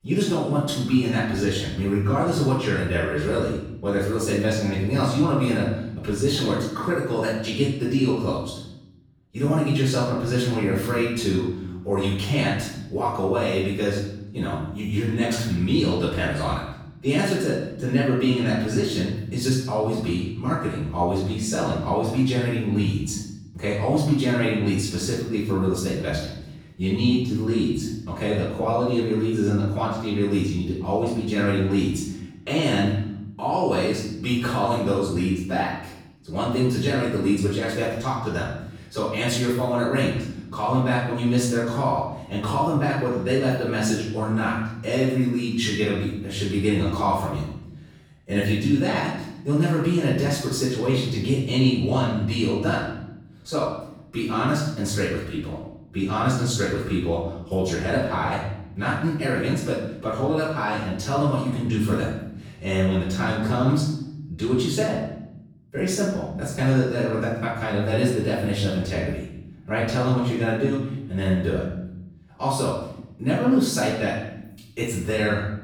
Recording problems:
off-mic speech; far
room echo; noticeable; dies away in 0.9 s

